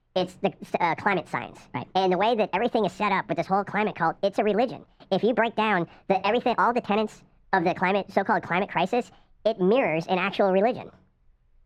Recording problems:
muffled; very; fading above 2 kHz
wrong speed and pitch; too fast and too high; 1.6 times normal speed

